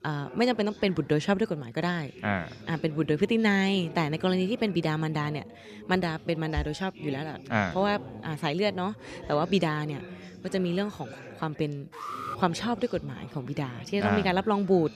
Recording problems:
background chatter; noticeable; throughout; 4 voices, 15 dB below the speech
alarm; noticeable; at 12 s; peak 7 dB below the speech

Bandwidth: 14.5 kHz